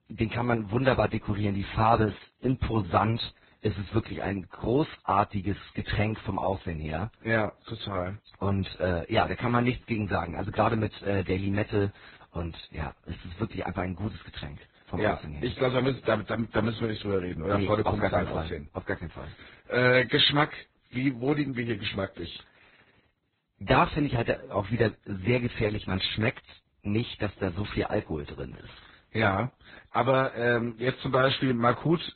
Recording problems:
garbled, watery; badly; nothing above 4 kHz

